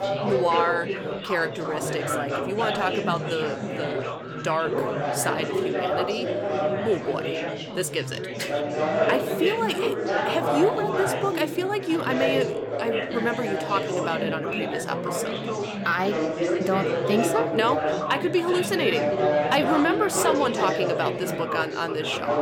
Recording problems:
chatter from many people; very loud; throughout; as loud as the speech

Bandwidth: 17 kHz